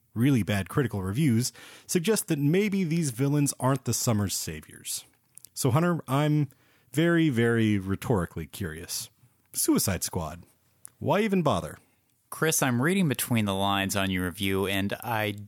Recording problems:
none

